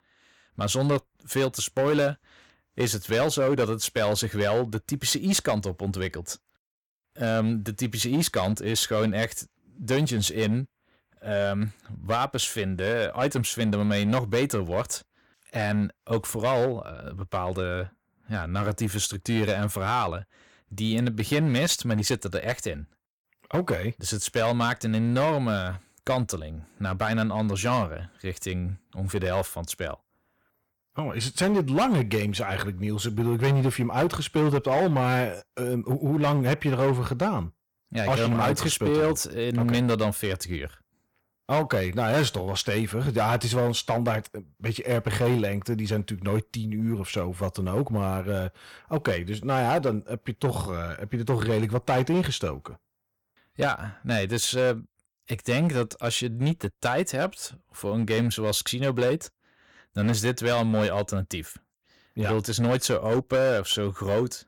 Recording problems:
distortion; slight; 7% of the sound clipped

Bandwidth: 18 kHz